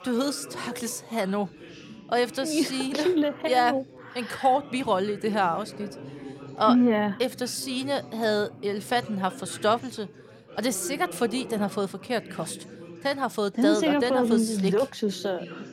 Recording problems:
background chatter; noticeable; throughout; 4 voices, 15 dB below the speech

